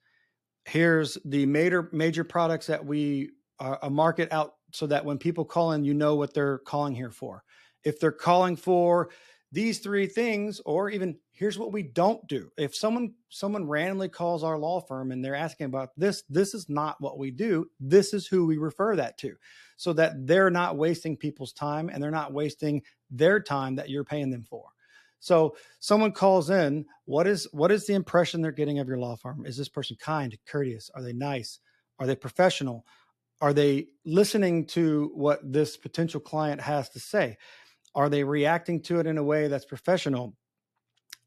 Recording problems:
none

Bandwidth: 13.5 kHz